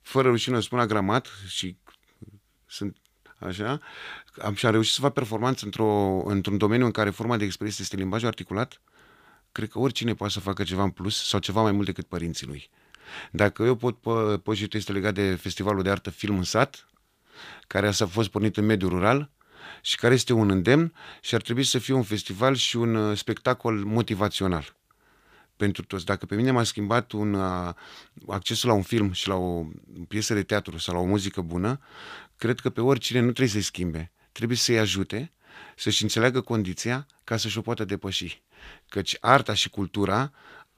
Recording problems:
none

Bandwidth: 15 kHz